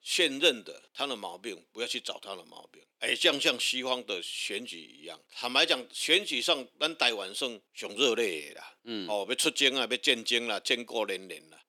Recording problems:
thin; somewhat; fading below 300 Hz

